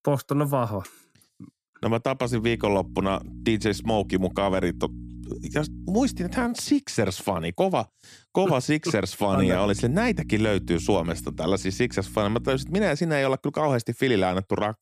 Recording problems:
electrical hum; faint; from 2.5 to 6.5 s and from 9.5 to 13 s; 60 Hz, 20 dB below the speech

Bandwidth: 14.5 kHz